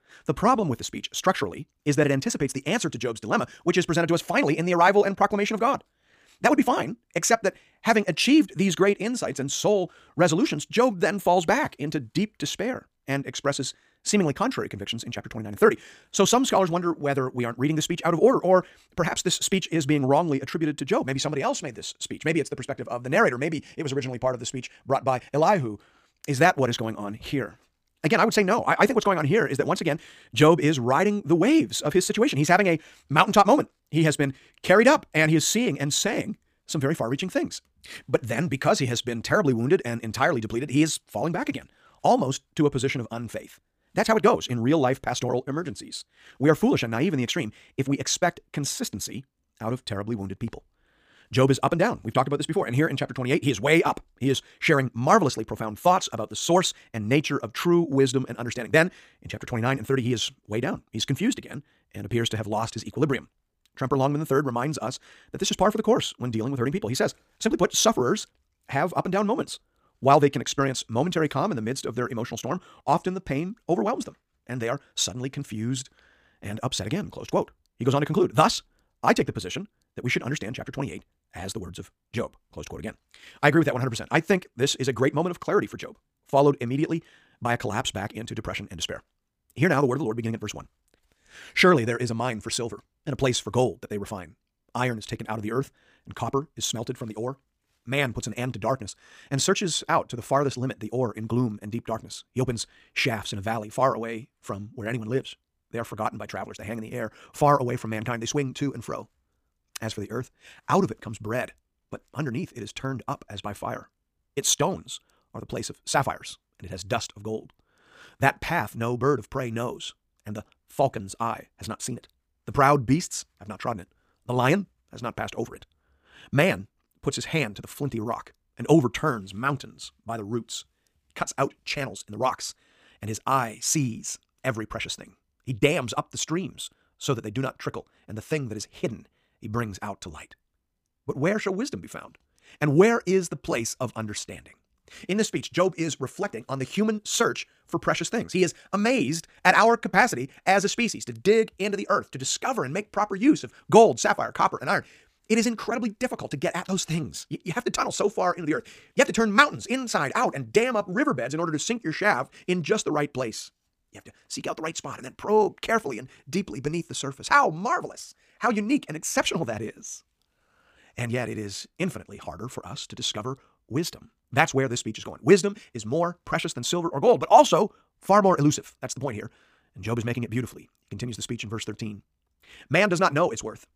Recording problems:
wrong speed, natural pitch; too fast; 1.7 times normal speed

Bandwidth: 15 kHz